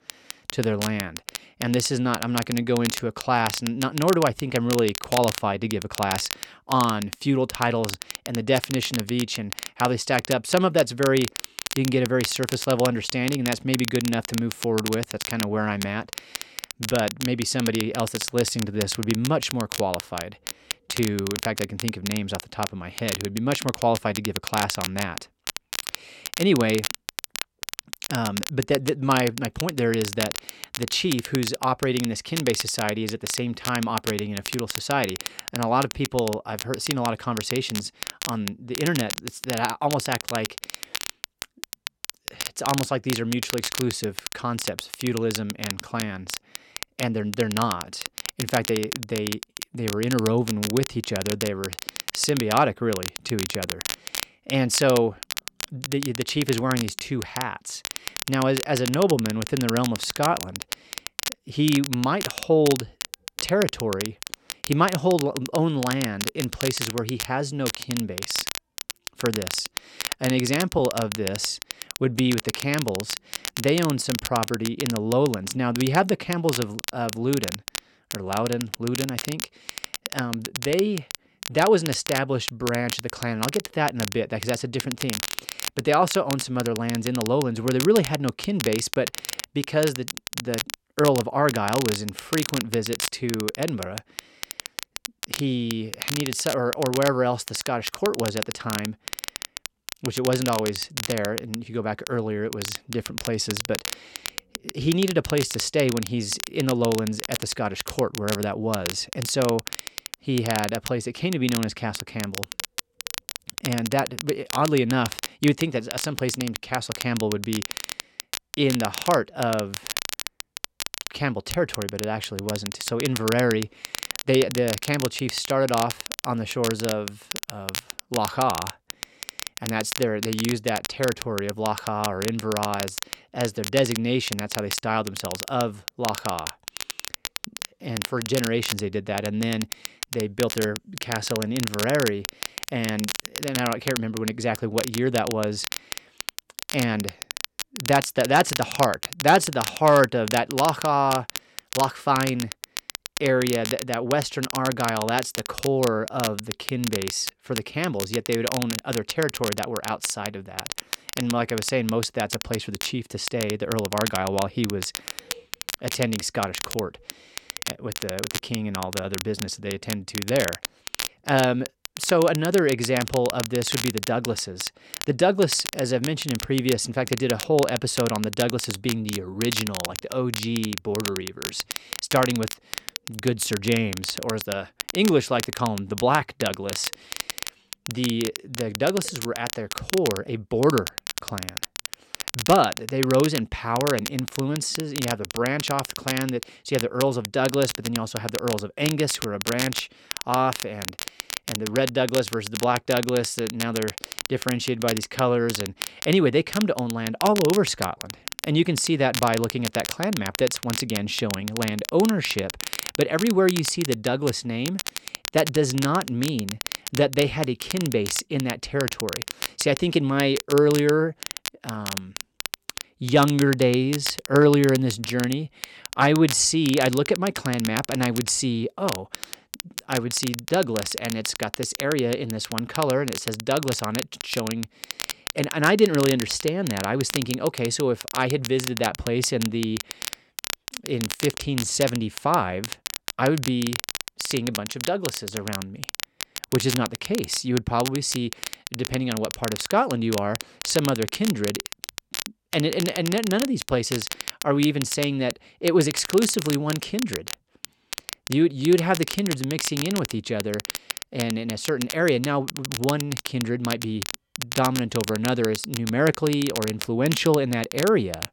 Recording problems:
crackle, like an old record; loud; 7 dB below the speech

